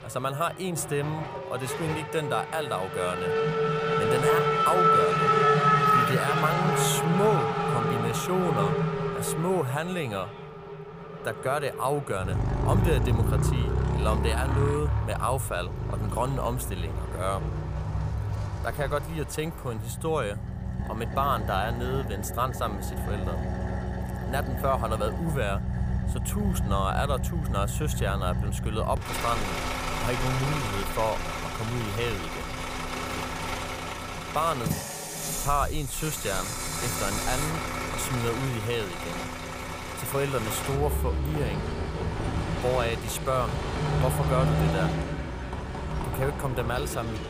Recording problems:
traffic noise; very loud; throughout; 2 dB above the speech

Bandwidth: 15 kHz